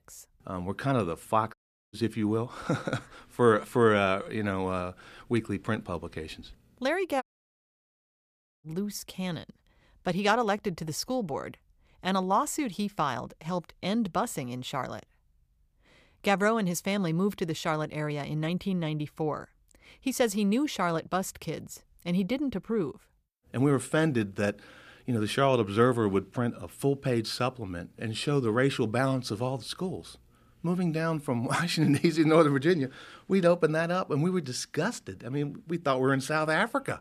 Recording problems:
audio cutting out; at 1.5 s and at 7 s for 1.5 s

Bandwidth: 15 kHz